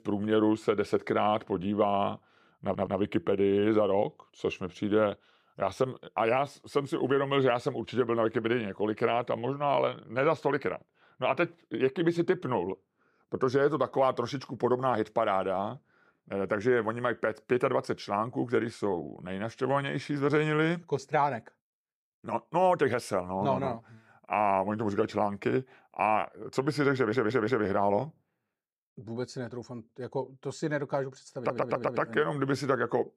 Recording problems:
audio stuttering; at 2.5 s, at 27 s and at 31 s

